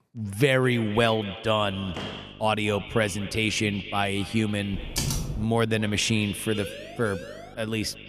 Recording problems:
echo of what is said; noticeable; throughout; 230 ms later, 15 dB below the speech
electrical hum; faint; from 1.5 s on; 50 Hz, 30 dB below the speech
door banging; faint; at 2 s; peak 10 dB below the speech
keyboard typing; noticeable; at 4.5 s; peak 2 dB below the speech
siren; faint; from 6.5 to 7.5 s; peak 15 dB below the speech

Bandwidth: 14.5 kHz